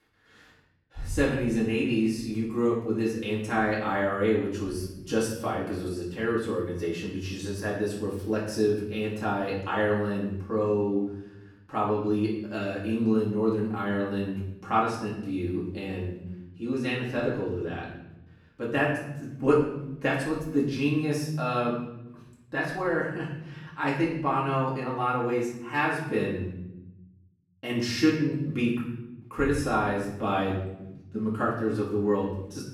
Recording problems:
off-mic speech; far
room echo; noticeable; dies away in 0.8 s

